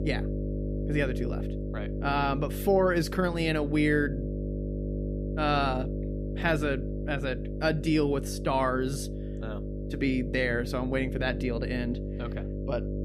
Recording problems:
electrical hum; noticeable; throughout; 50 Hz, 10 dB below the speech

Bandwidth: 15 kHz